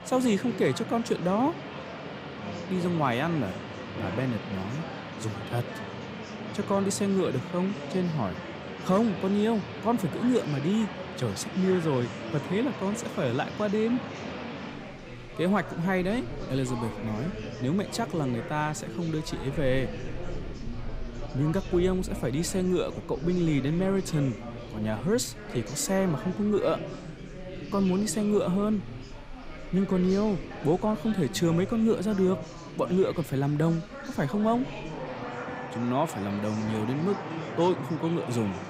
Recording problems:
rain or running water; noticeable; throughout; 15 dB below the speech
chatter from many people; noticeable; throughout; 10 dB below the speech

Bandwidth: 15.5 kHz